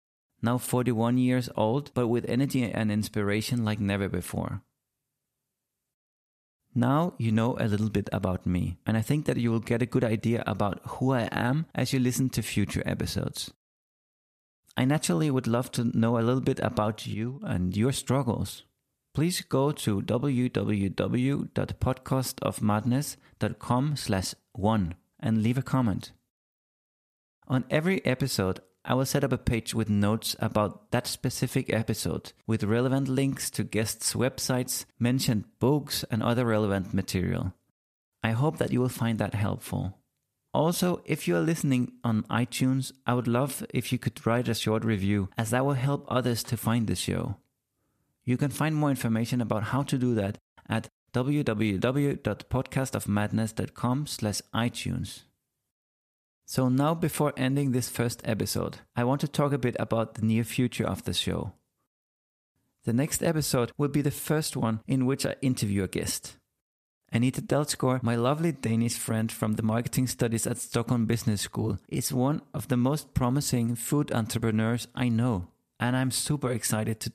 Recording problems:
none

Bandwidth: 14.5 kHz